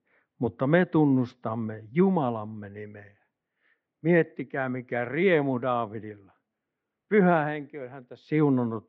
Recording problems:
muffled; very; fading above 2.5 kHz

